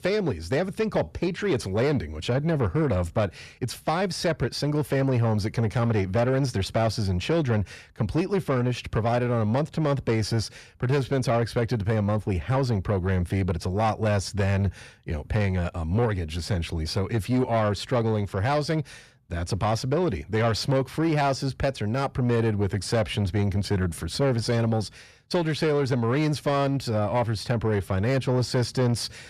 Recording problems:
distortion; slight; 10 dB below the speech

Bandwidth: 14.5 kHz